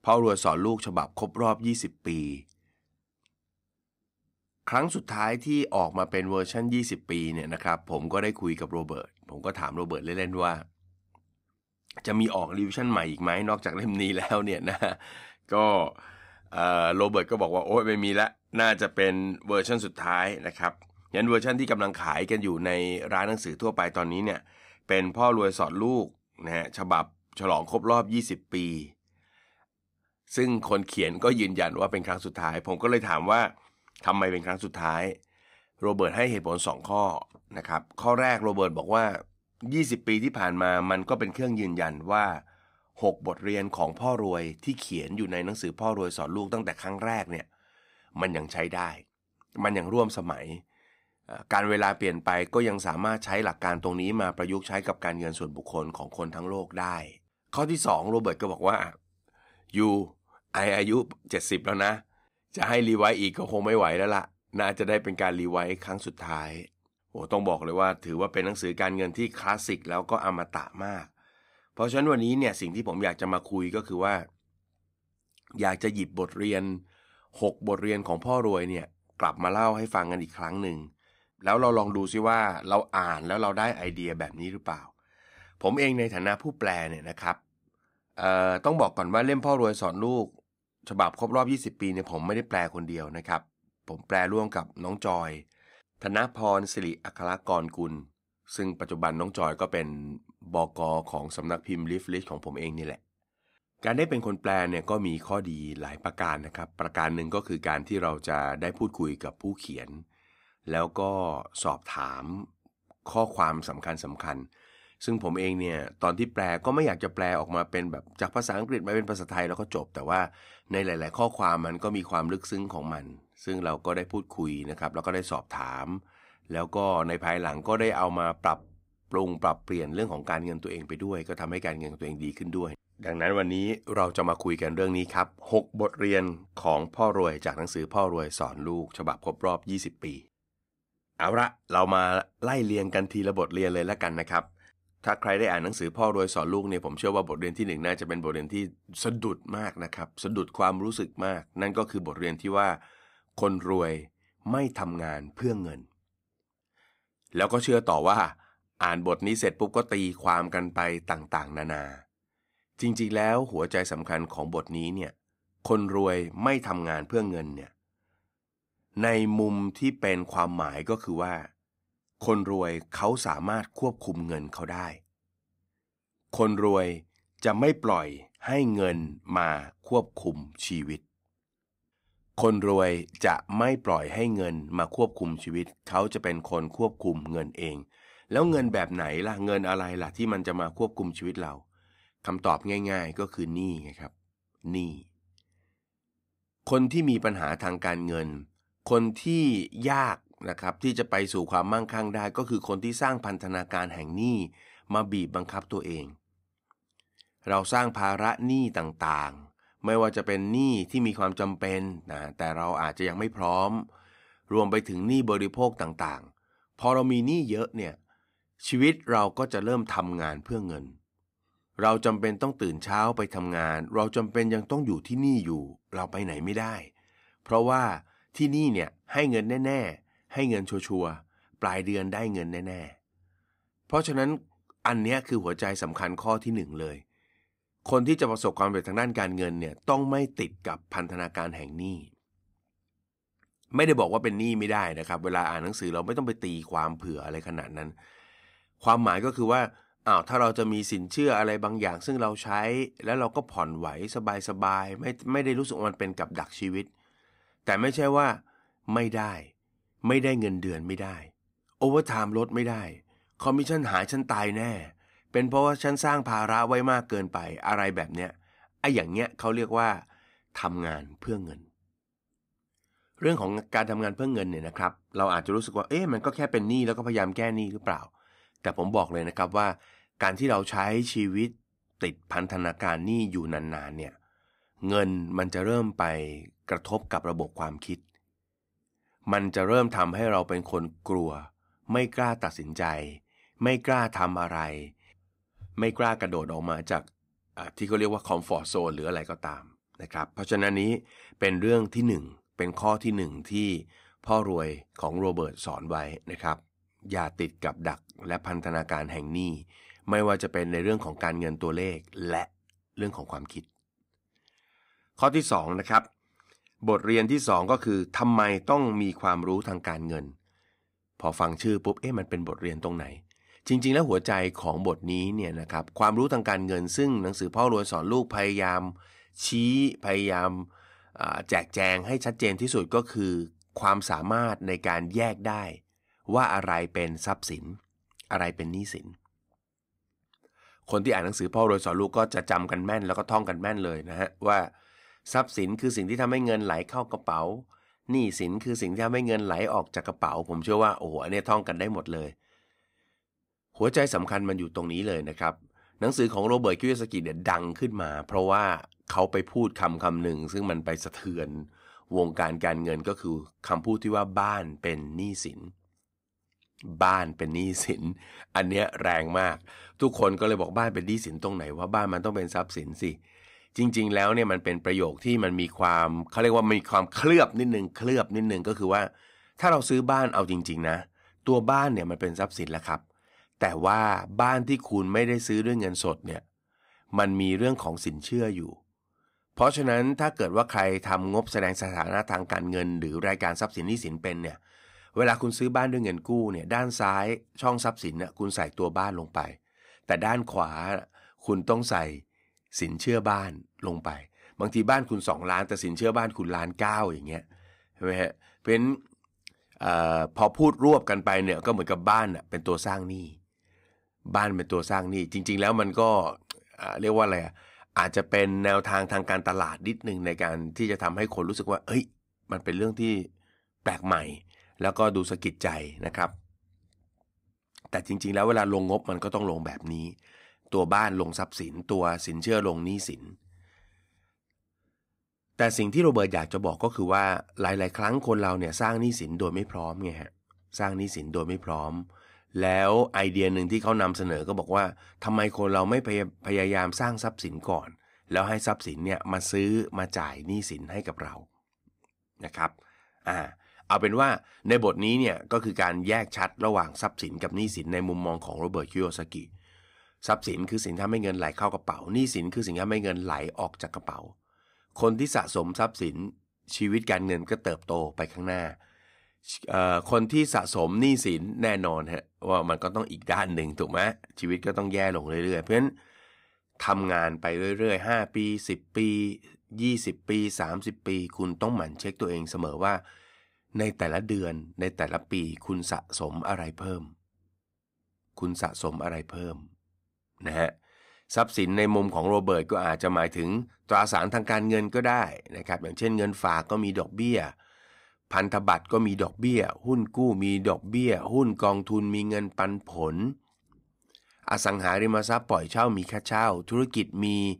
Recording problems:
none

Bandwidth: 15.5 kHz